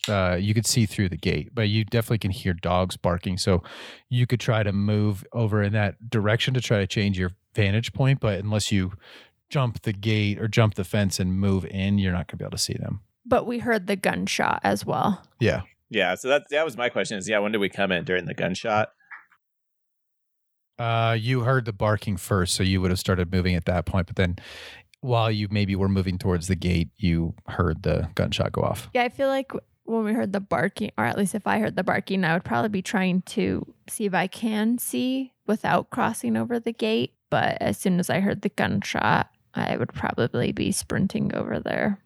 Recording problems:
none

